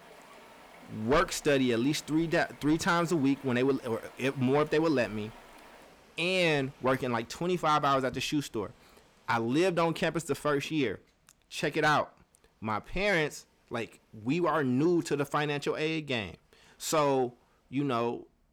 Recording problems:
distortion; slight; 10 dB below the speech
rain or running water; faint; throughout; 25 dB below the speech

